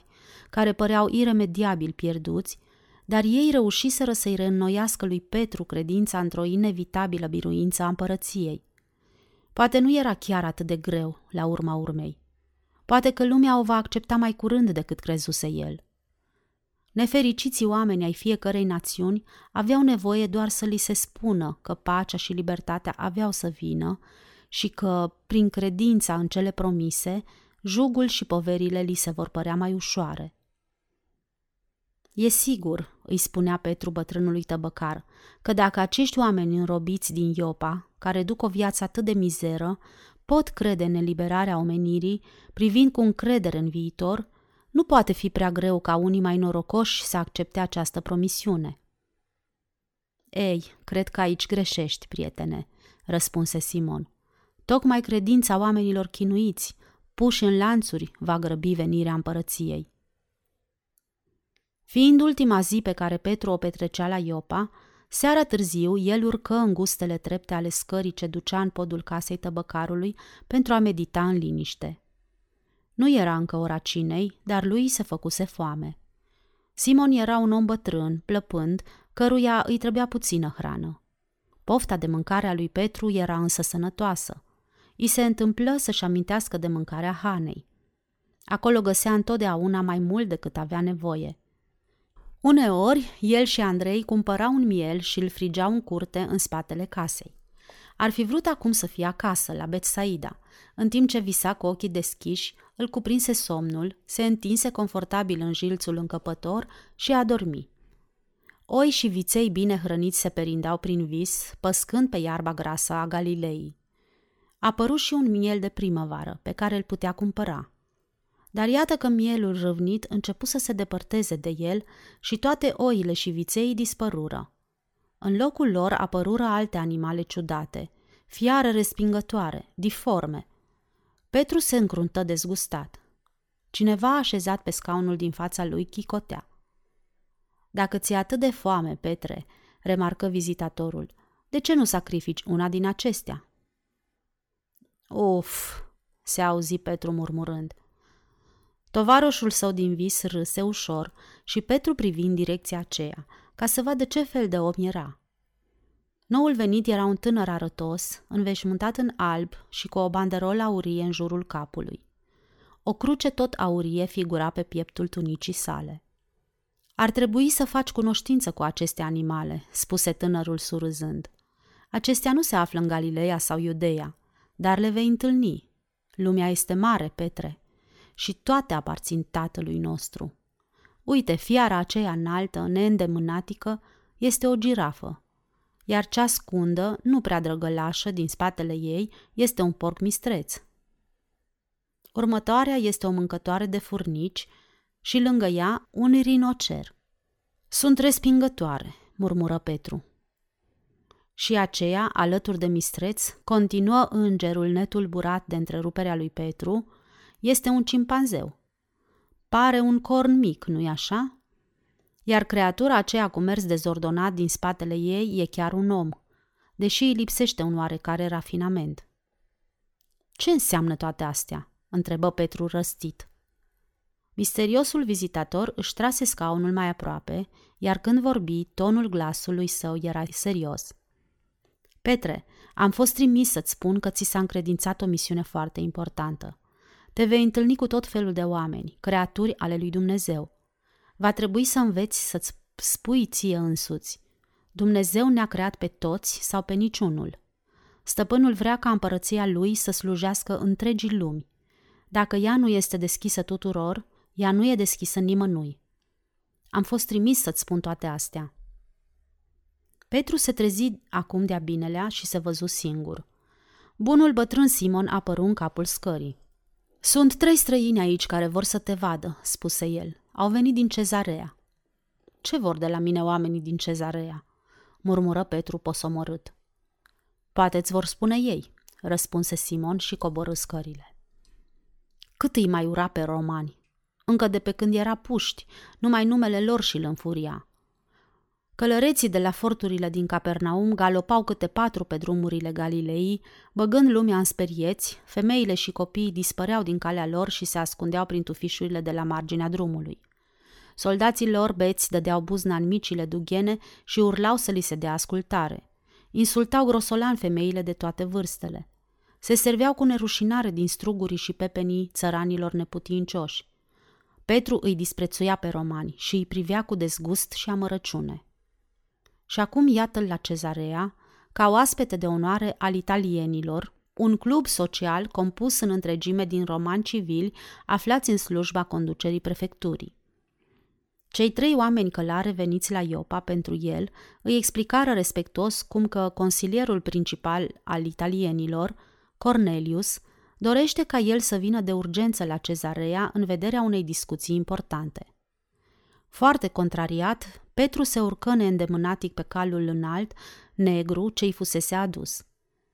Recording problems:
none

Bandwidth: 18 kHz